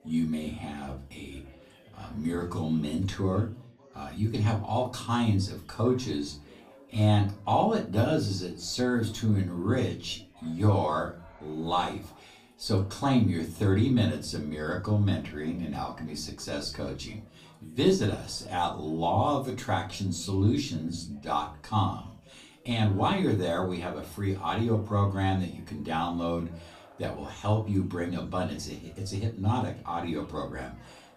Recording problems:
off-mic speech; far
room echo; very slight; dies away in 0.3 s
background chatter; faint; throughout; 4 voices, 25 dB below the speech

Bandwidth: 15 kHz